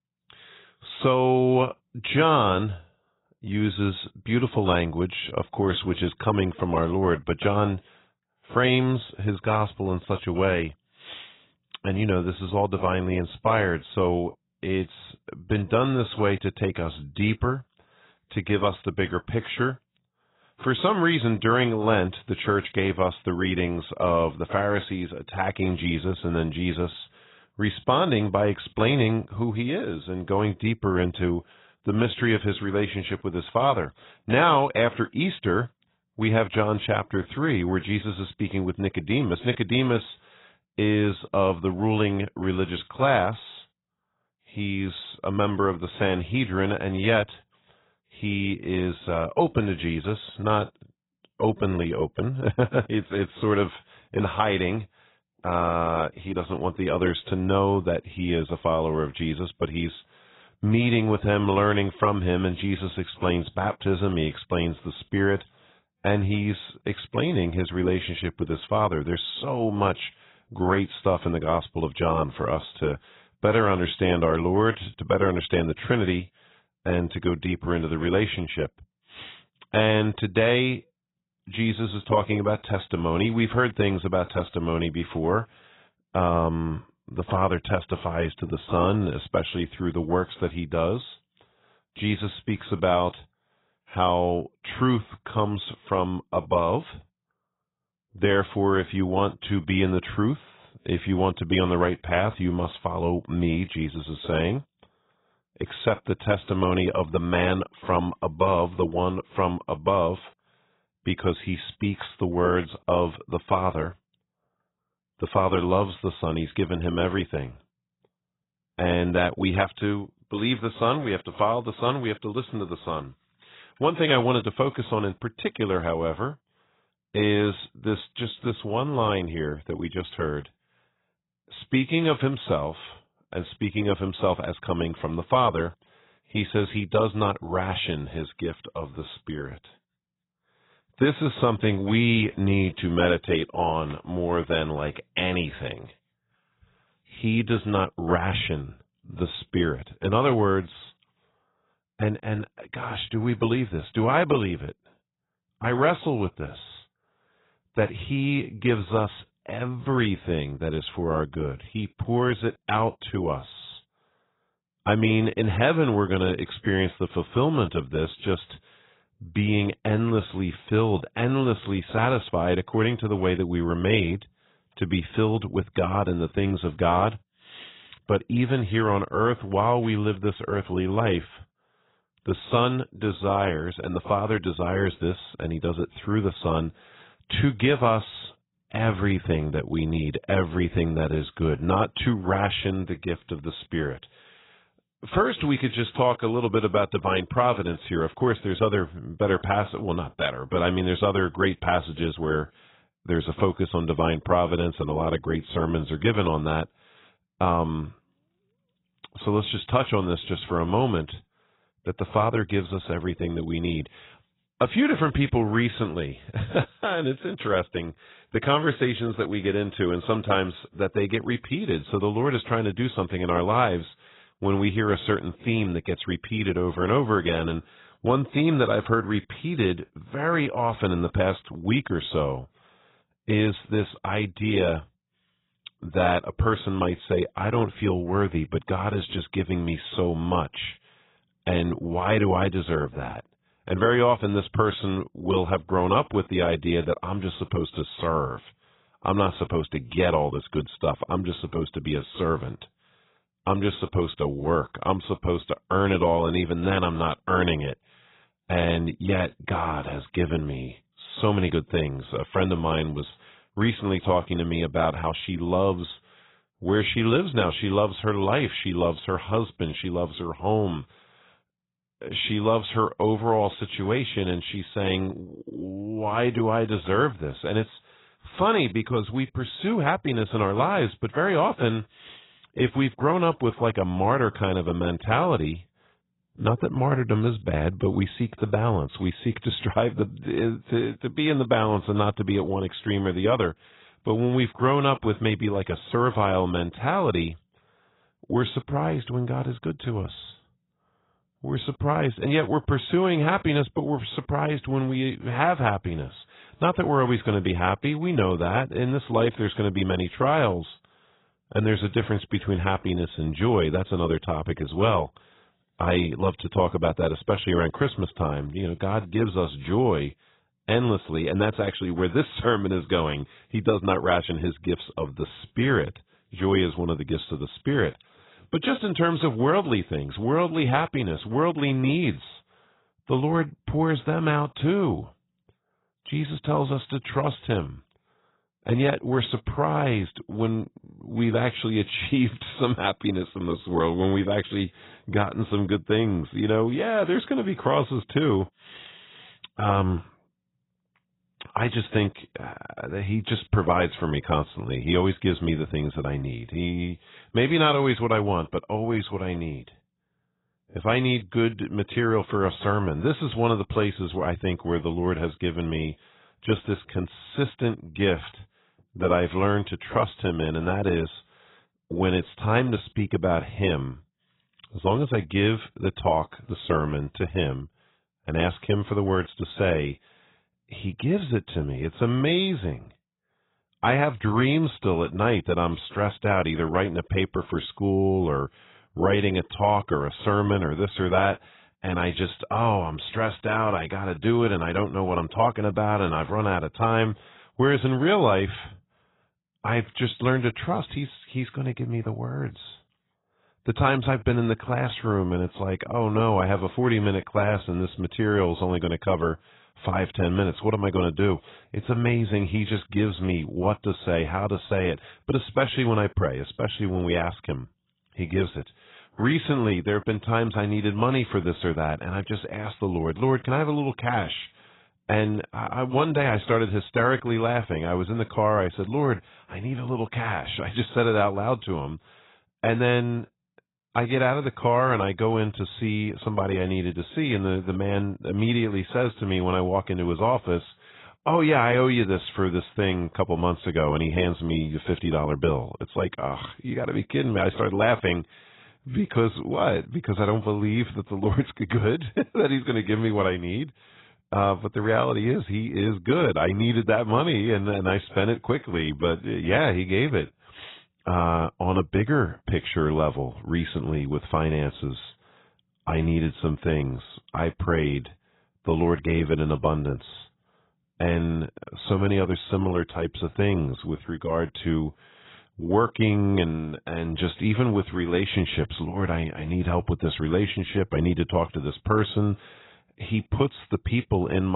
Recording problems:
garbled, watery; badly; nothing above 4 kHz
abrupt cut into speech; at the end

